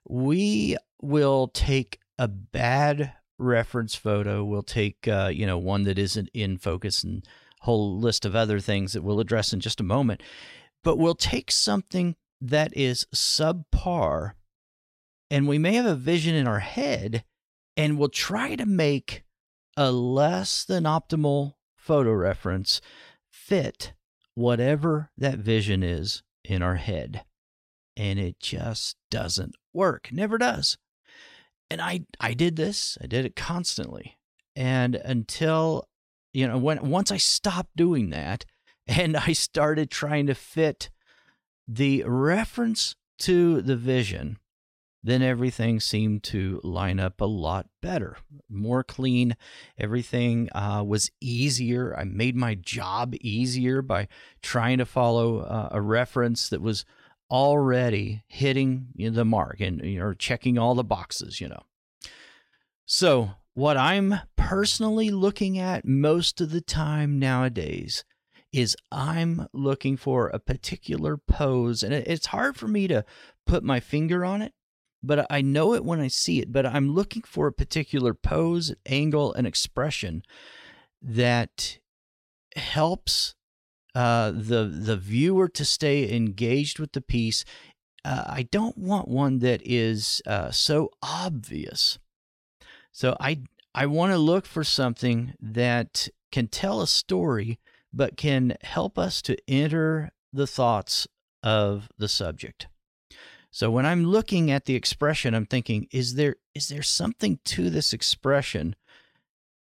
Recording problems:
none

